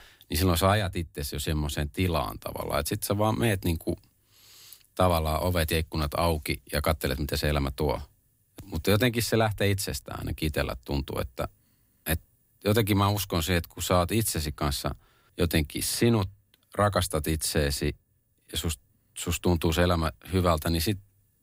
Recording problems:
none

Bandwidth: 15.5 kHz